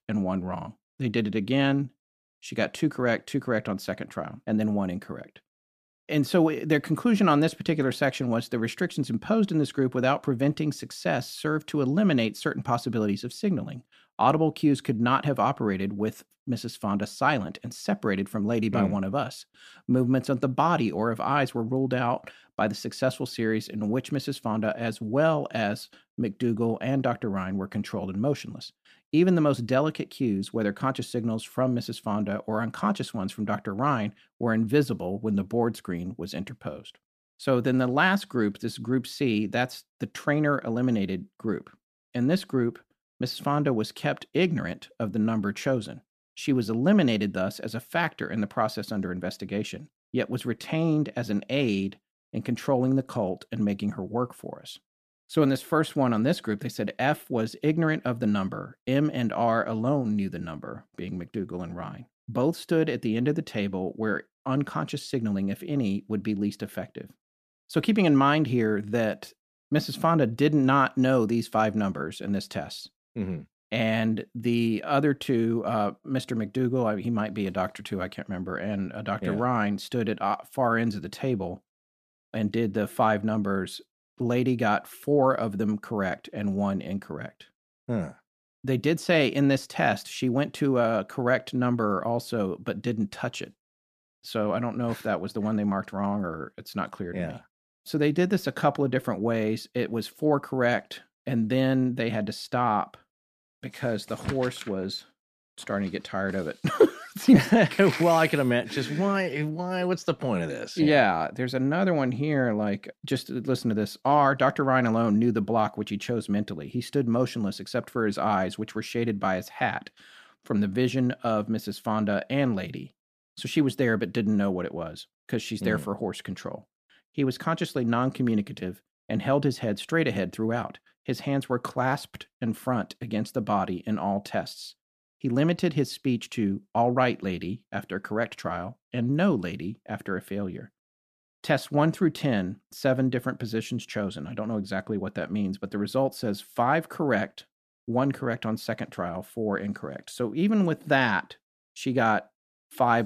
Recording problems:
abrupt cut into speech; at the end

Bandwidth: 14.5 kHz